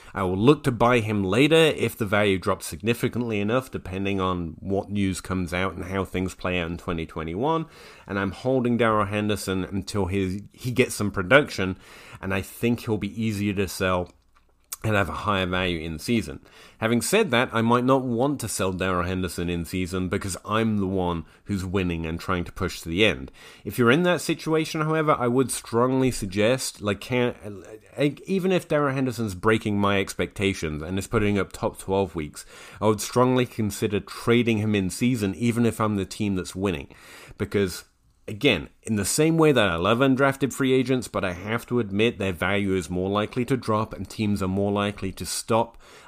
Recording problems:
none

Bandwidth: 15 kHz